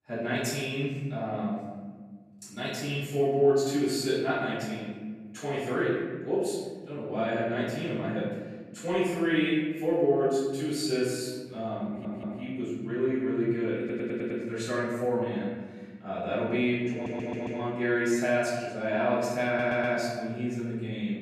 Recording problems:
room echo; strong; dies away in 1.5 s
off-mic speech; far
audio stuttering; 4 times, first at 12 s

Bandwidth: 13.5 kHz